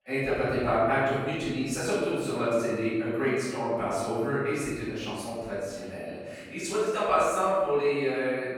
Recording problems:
room echo; strong; dies away in 1.4 s
off-mic speech; far

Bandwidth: 17 kHz